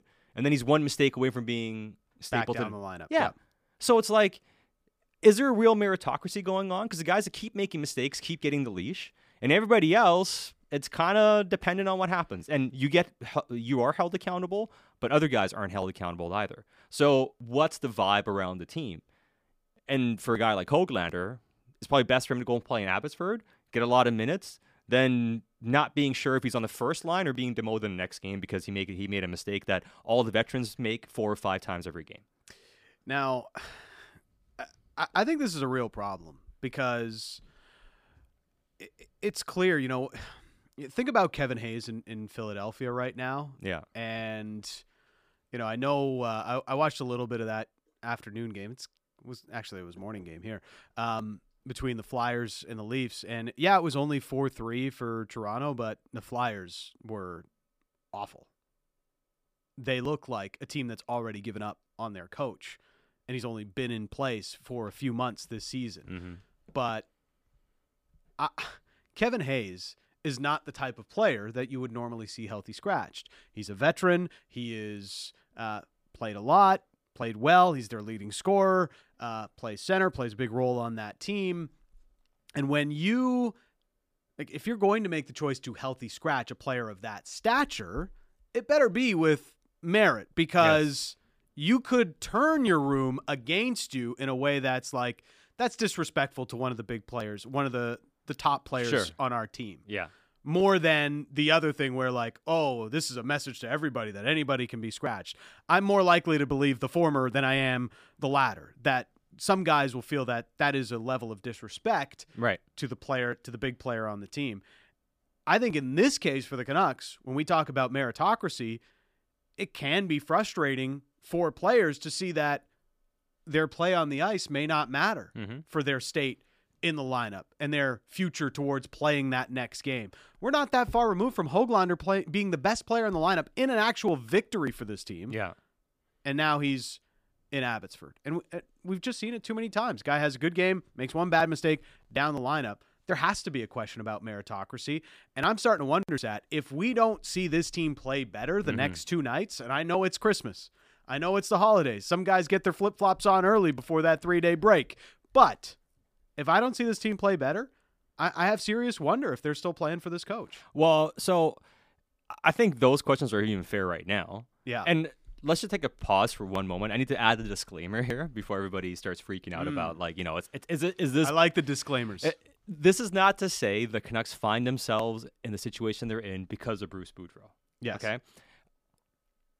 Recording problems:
none

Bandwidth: 15 kHz